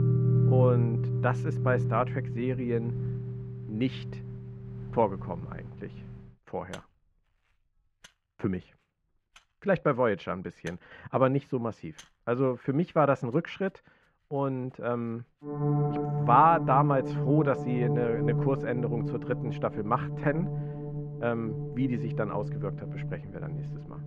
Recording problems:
muffled; very; fading above 1.5 kHz
background music; loud; throughout; 2 dB below the speech

